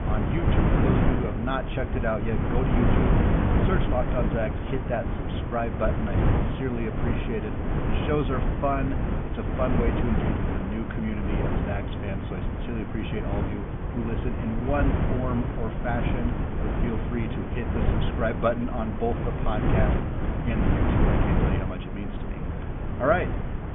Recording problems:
high frequencies cut off; severe; nothing above 3.5 kHz
wind noise on the microphone; heavy; 1 dB below the speech

